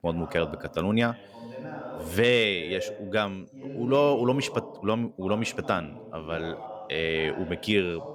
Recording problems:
voice in the background; noticeable; throughout; 15 dB below the speech

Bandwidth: 18.5 kHz